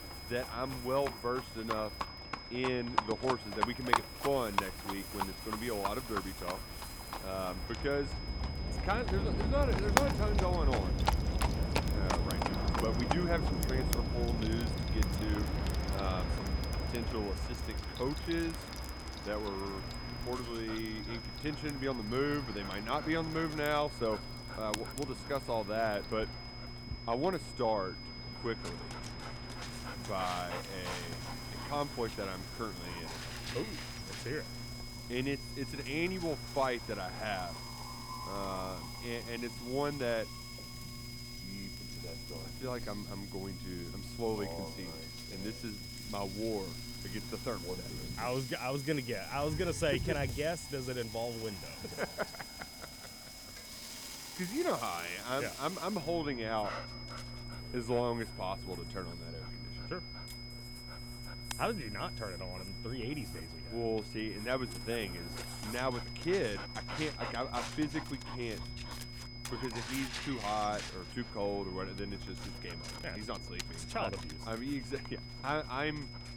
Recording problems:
high-pitched whine; loud; throughout; 5 kHz, 10 dB below the speech
animal sounds; loud; throughout; 7 dB below the speech
train or aircraft noise; loud; throughout; 2 dB below the speech
electrical hum; noticeable; from 20 to 48 s and from 56 s on; 60 Hz, 20 dB below the speech
household noises; noticeable; throughout; 10 dB below the speech

